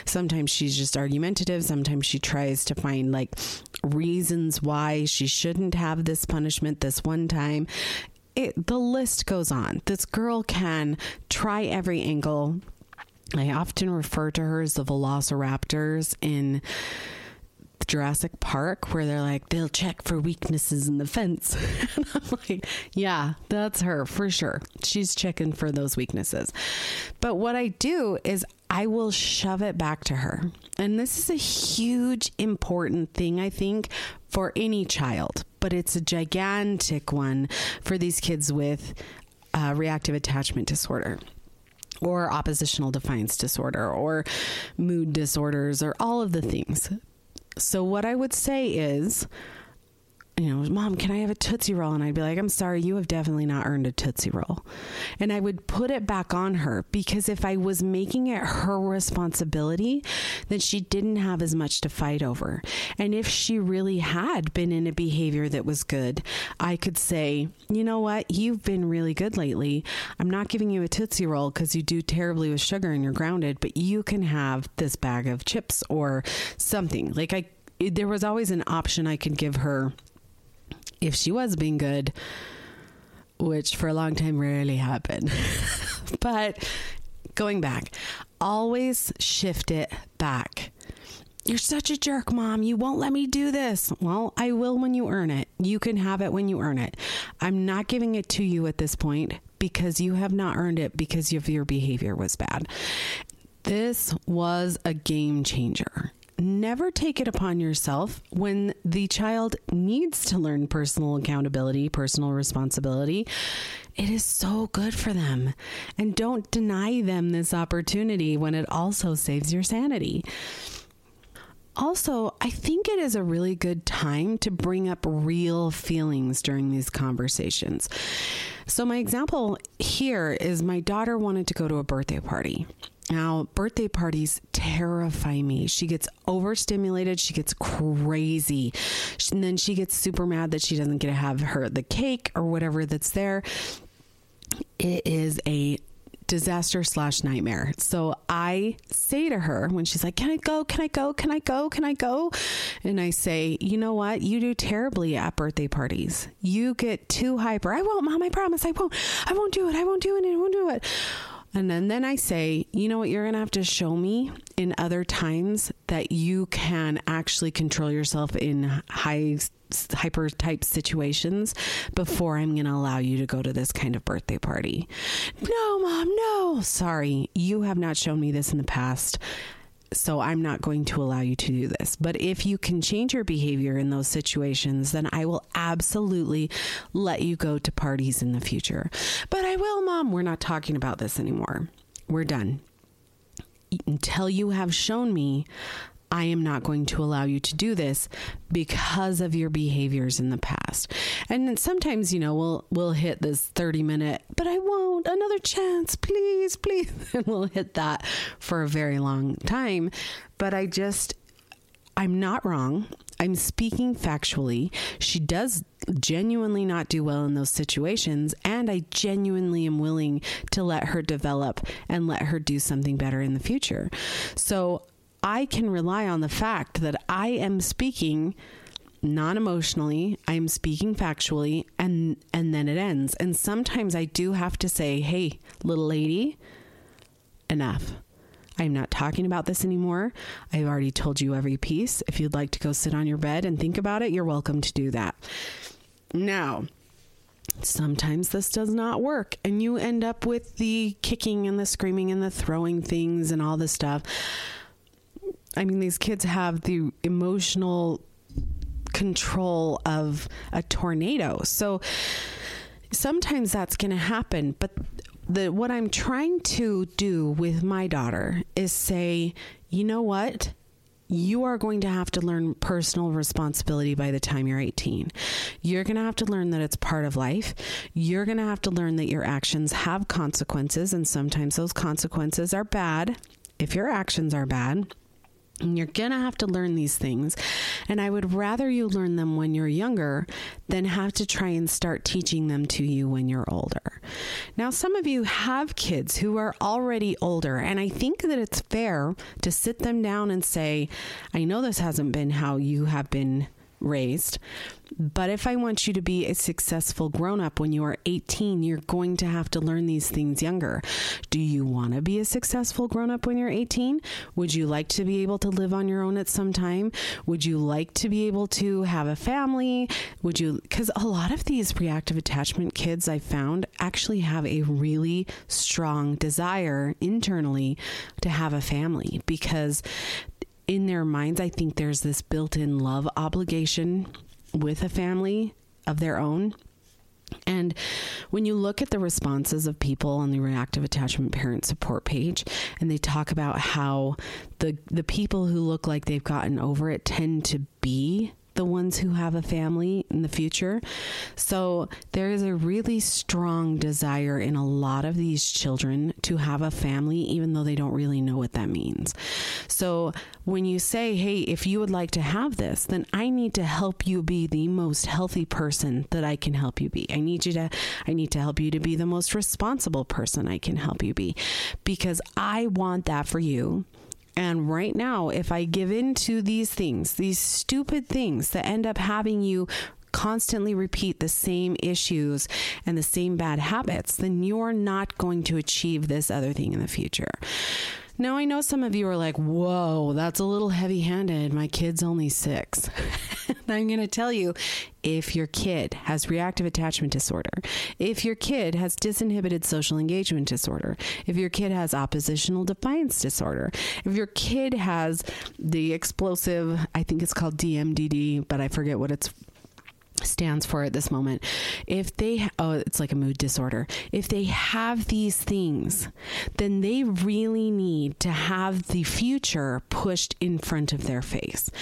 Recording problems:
squashed, flat; heavily

